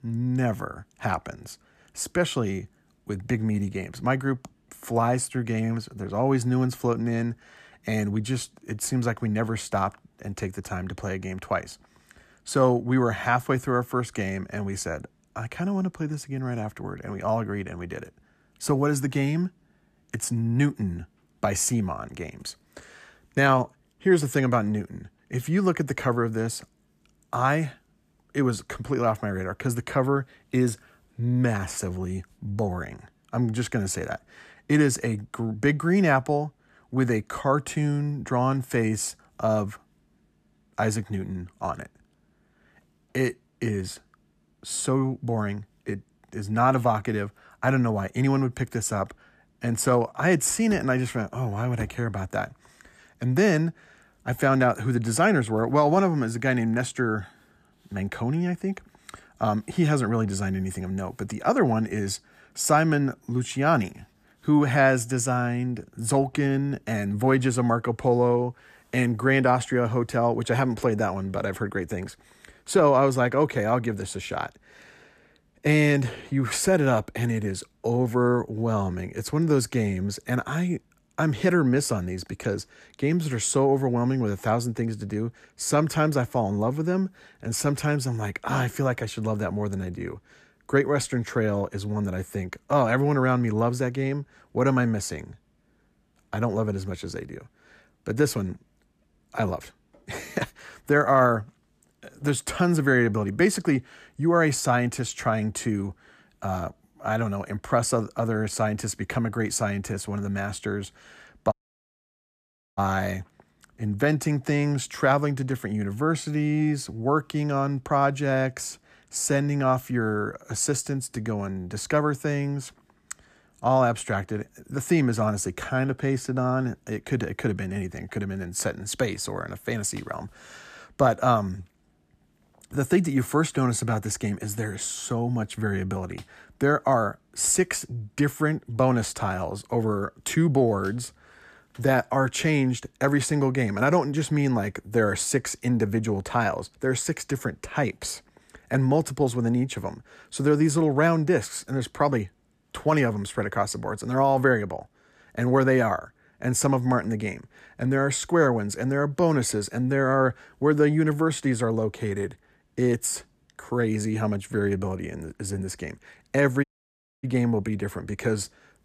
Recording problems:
audio cutting out; at 1:52 for 1.5 s and at 2:47 for 0.5 s

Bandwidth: 14.5 kHz